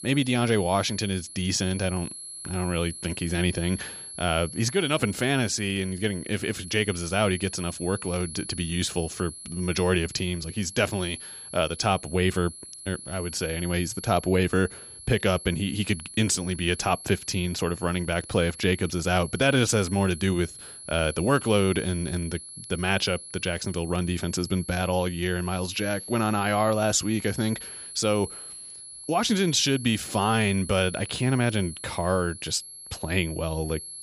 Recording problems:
high-pitched whine; noticeable; throughout; 11 kHz, 10 dB below the speech

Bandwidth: 14.5 kHz